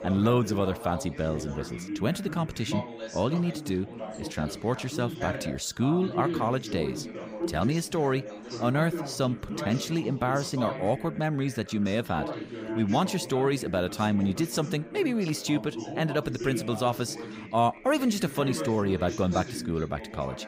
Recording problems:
background chatter; loud; throughout; 3 voices, 9 dB below the speech

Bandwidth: 15.5 kHz